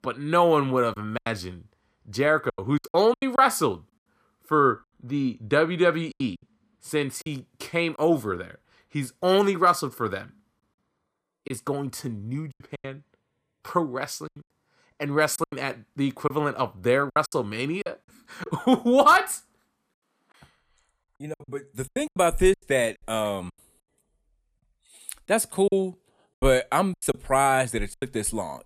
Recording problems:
choppy; very; 9% of the speech affected

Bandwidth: 14.5 kHz